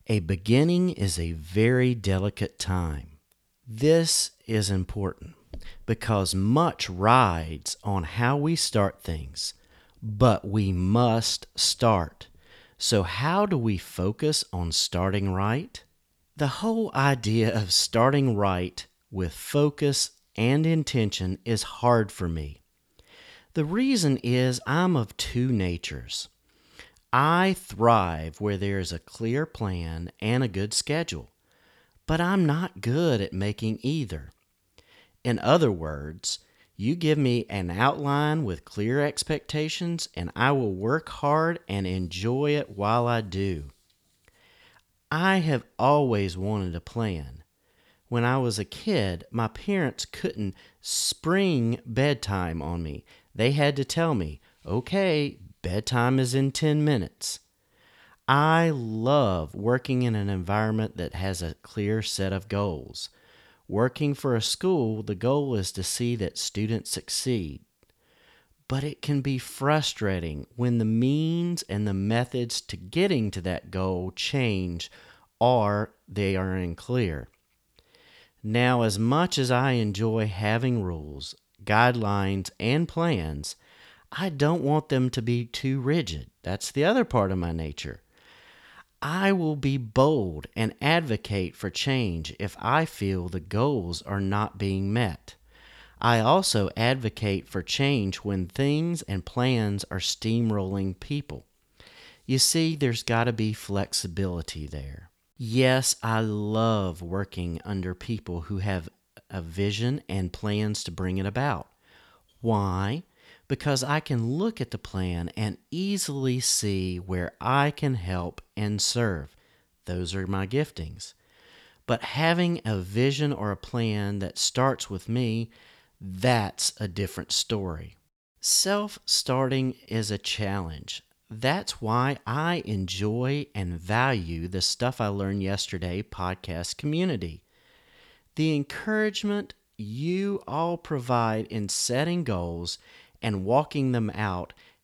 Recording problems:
none

